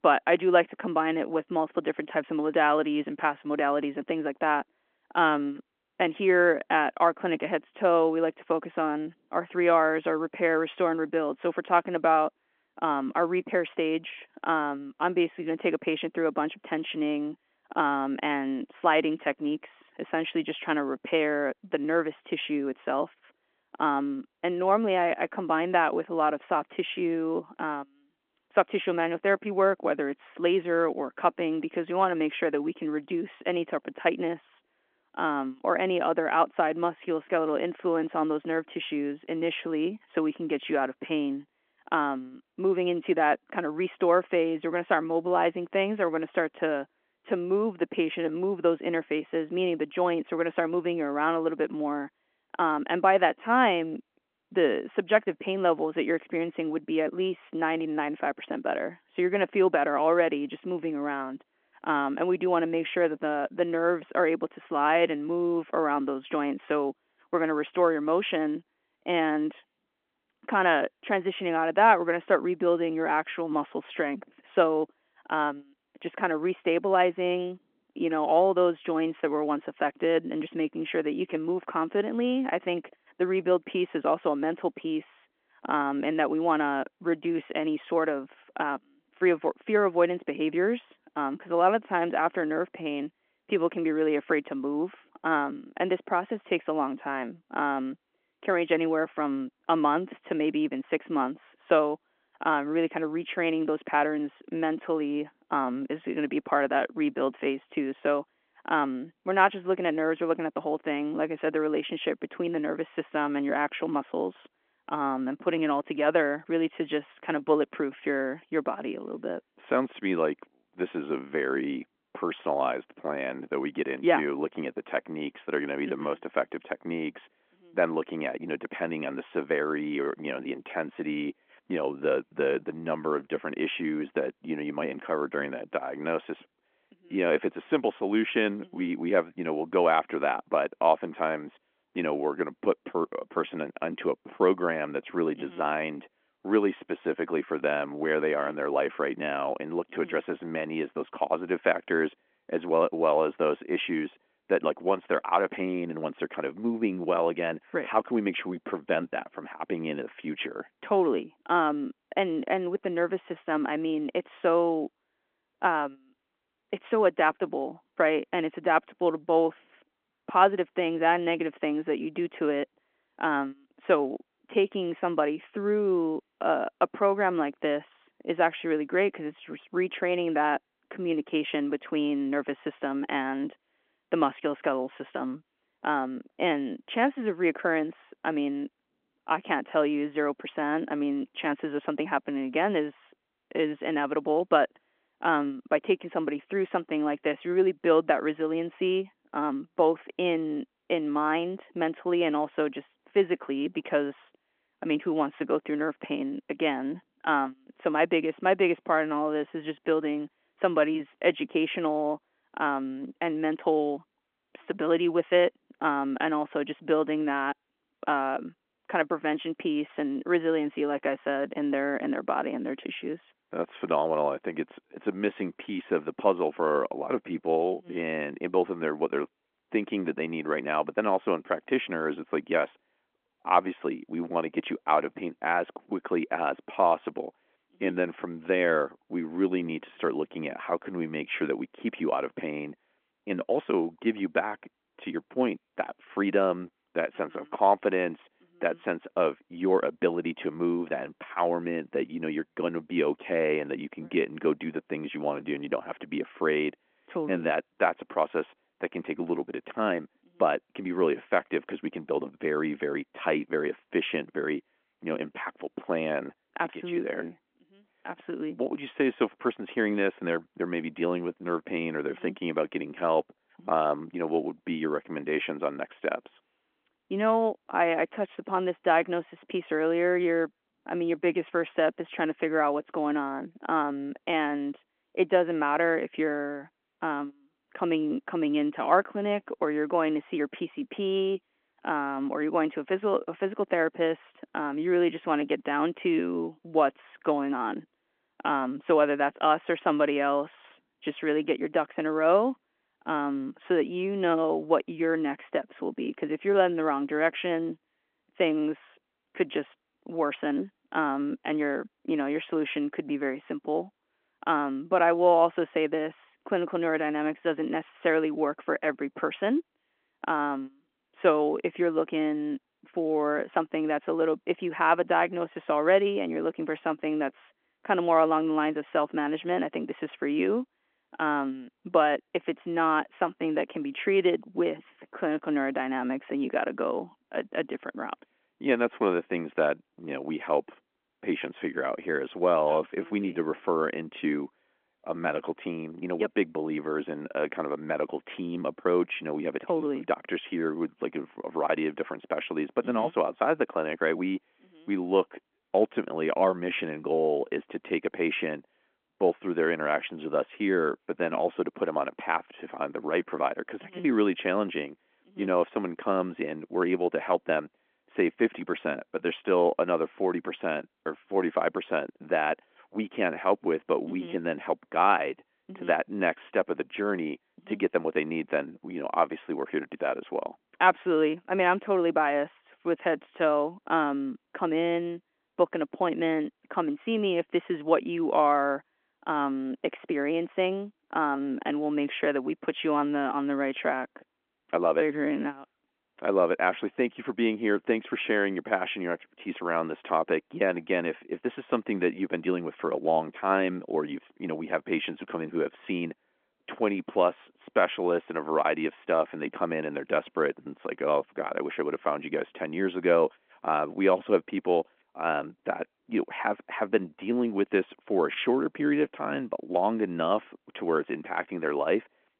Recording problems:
phone-call audio

